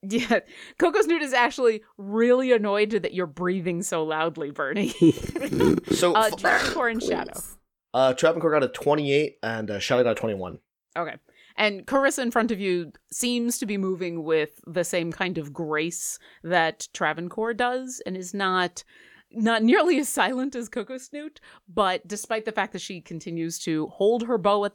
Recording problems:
none

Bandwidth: 18.5 kHz